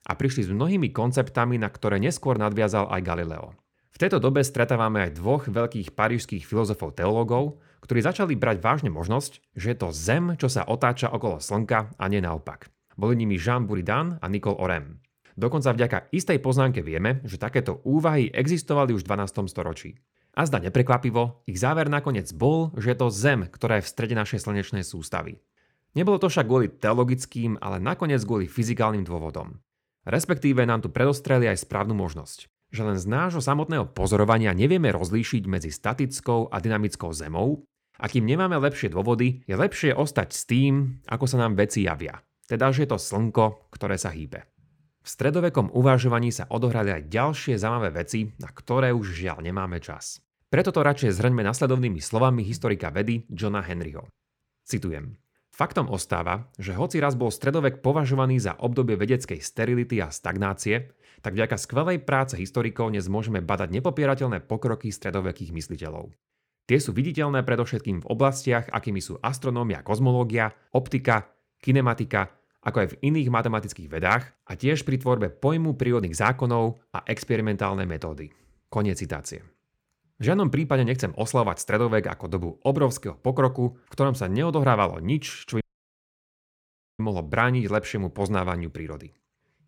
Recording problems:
audio cutting out; at 1:26 for 1.5 s

